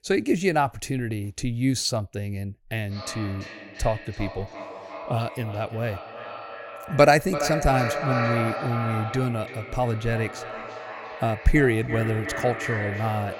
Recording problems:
echo of what is said; strong; from 3 s on; 340 ms later, 7 dB below the speech

